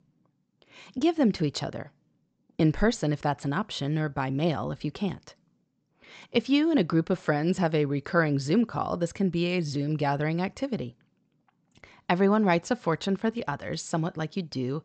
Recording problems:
high frequencies cut off; noticeable; nothing above 8 kHz

